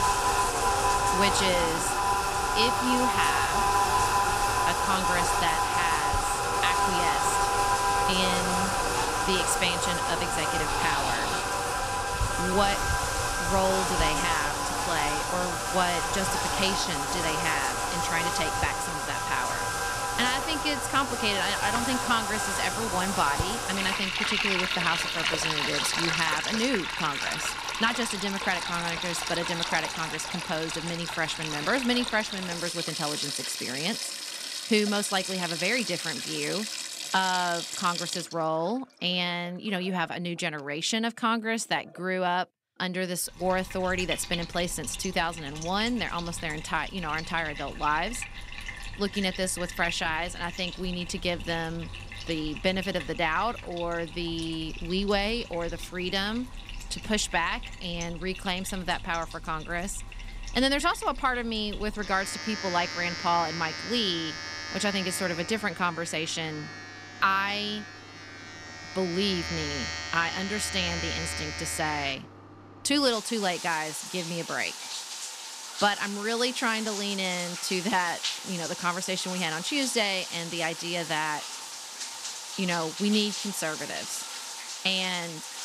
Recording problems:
household noises; loud; throughout; as loud as the speech

